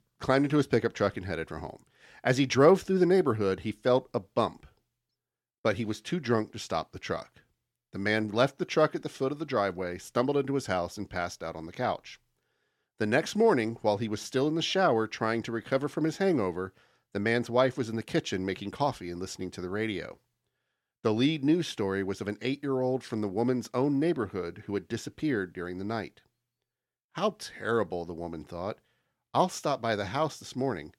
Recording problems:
none

